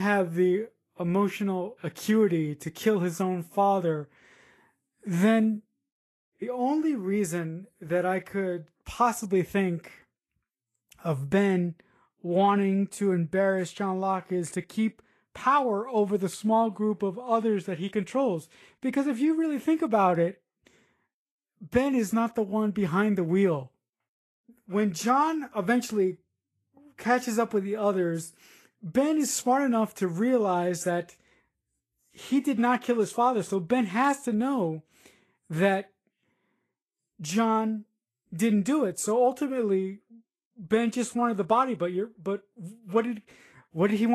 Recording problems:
garbled, watery; slightly; nothing above 12.5 kHz
abrupt cut into speech; at the start and the end

